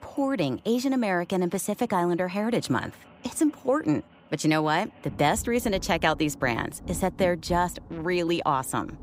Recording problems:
rain or running water; noticeable; throughout; 20 dB below the speech

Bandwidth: 15.5 kHz